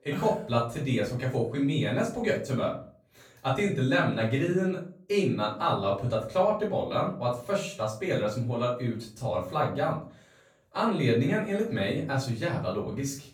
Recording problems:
off-mic speech; far
room echo; slight; dies away in 0.4 s

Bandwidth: 18 kHz